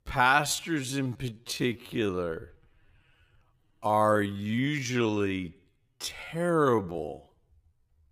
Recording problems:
wrong speed, natural pitch; too slow; 0.5 times normal speed

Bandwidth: 15.5 kHz